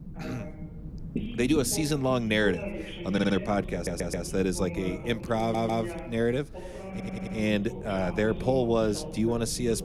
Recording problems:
voice in the background; noticeable; throughout; 10 dB below the speech
low rumble; faint; throughout; 20 dB below the speech
audio stuttering; 4 times, first at 3 s

